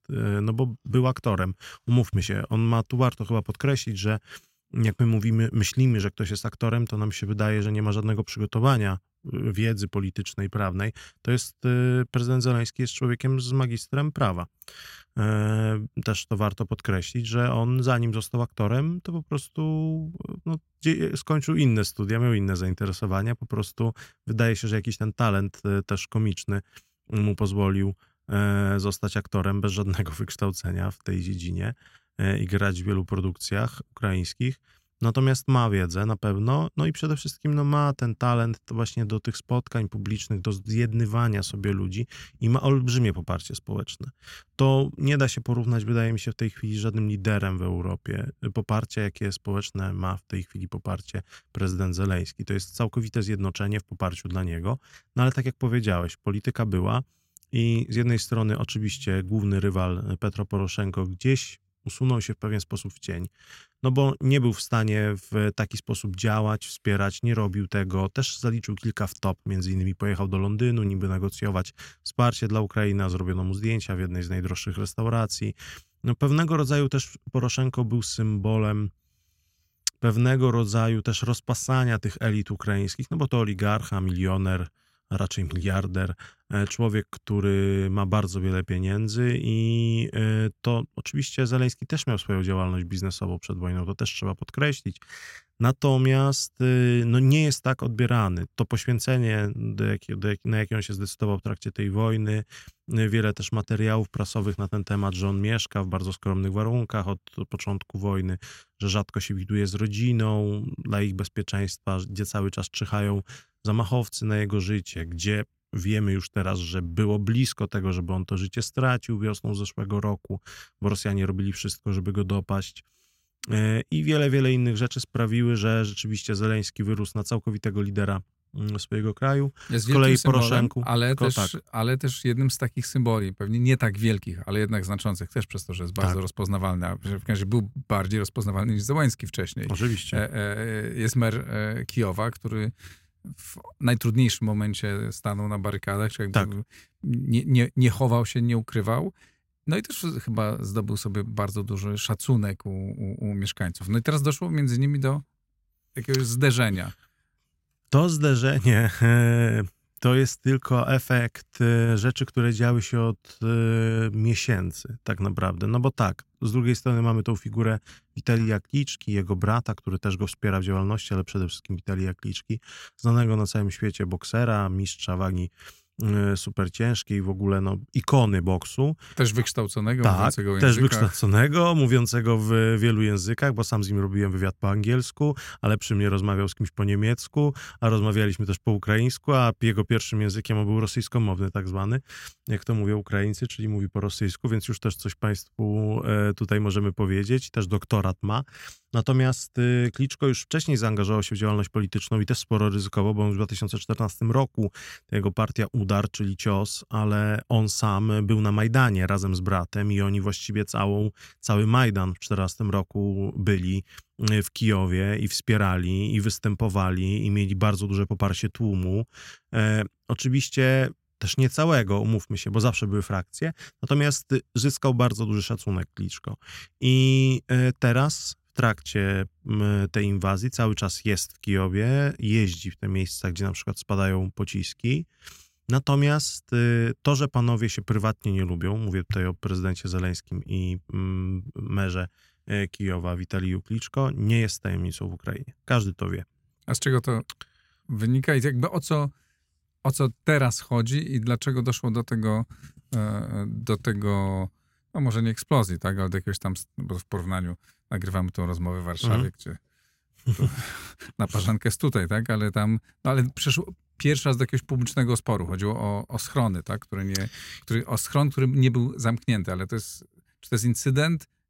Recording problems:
none

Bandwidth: 16 kHz